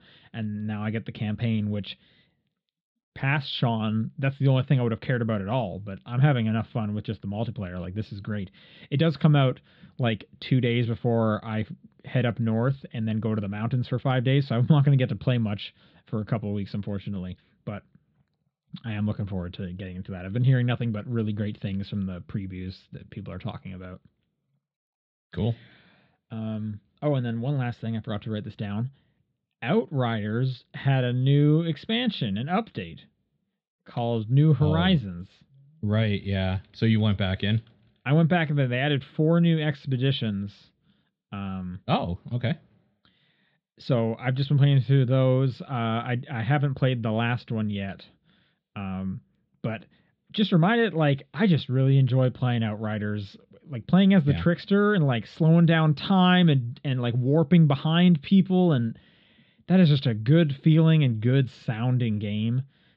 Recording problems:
muffled; slightly; fading above 4 kHz

